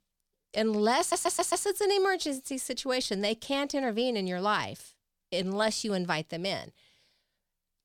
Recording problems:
audio stuttering; at 1 s

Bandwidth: 19 kHz